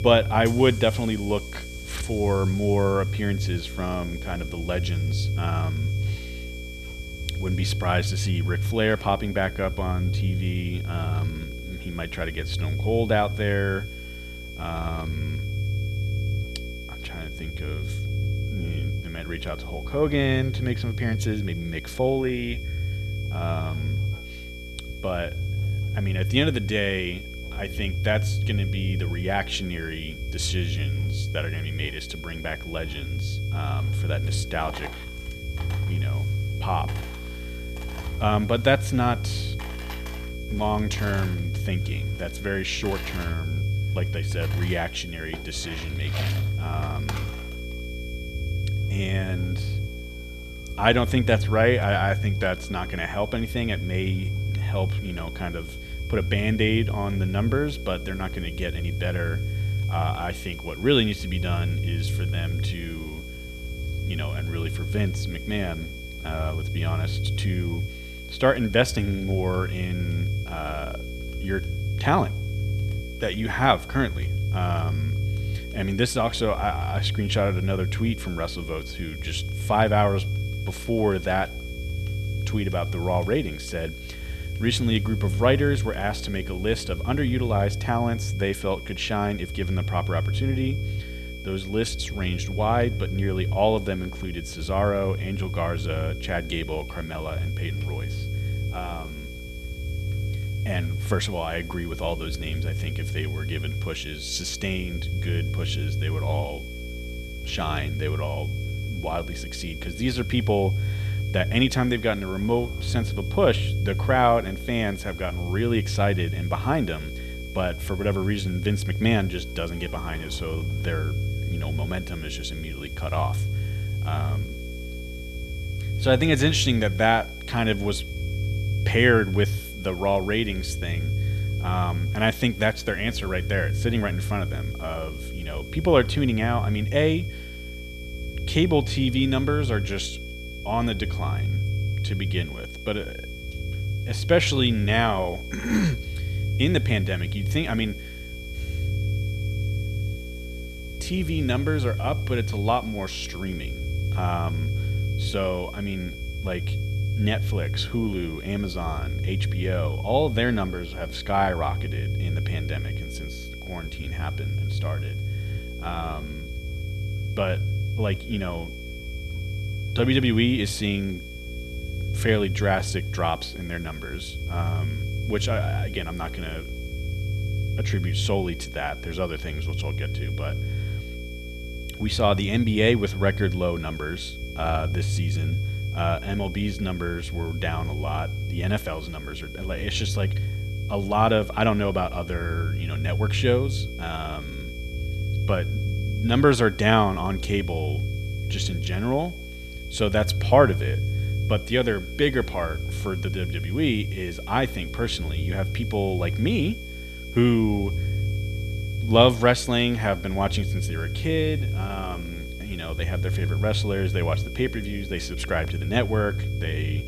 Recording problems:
electrical hum; noticeable; throughout; 60 Hz, 20 dB below the speech
high-pitched whine; noticeable; throughout; 2.5 kHz, 15 dB below the speech
low rumble; noticeable; throughout; 15 dB below the speech
household noises; faint; throughout; 25 dB below the speech
hiss; faint; throughout; 25 dB below the speech

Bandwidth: 14.5 kHz